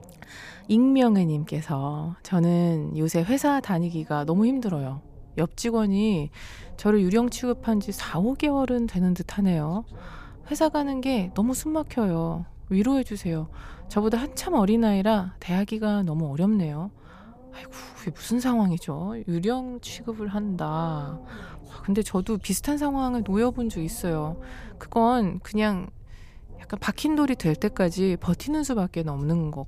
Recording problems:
low rumble; faint; throughout; 25 dB below the speech

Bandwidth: 15 kHz